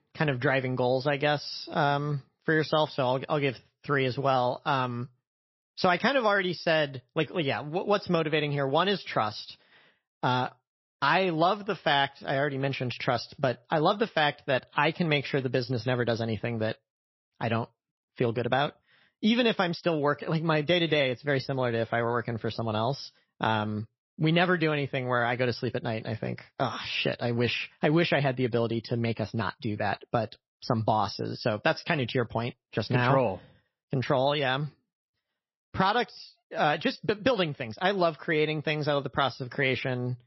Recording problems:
garbled, watery; slightly; nothing above 5.5 kHz

